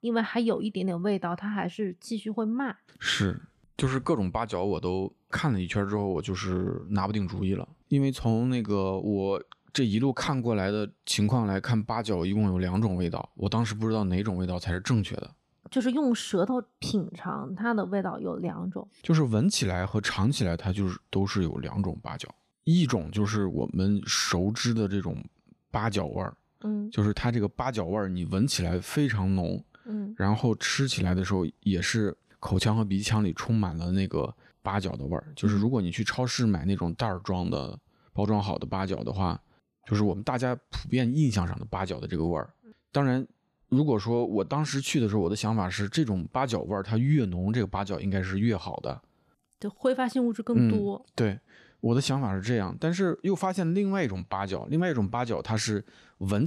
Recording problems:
abrupt cut into speech; at the end

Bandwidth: 14 kHz